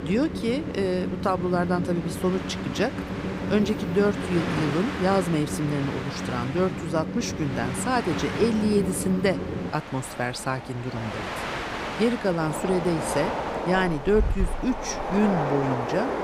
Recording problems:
train or aircraft noise; loud; throughout; 4 dB below the speech

